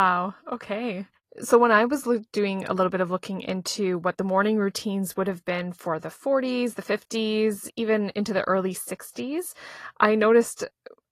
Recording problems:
garbled, watery; slightly; nothing above 12.5 kHz
abrupt cut into speech; at the start

